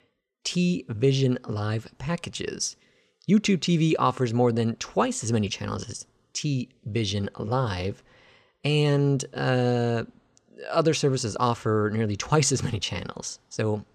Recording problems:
none

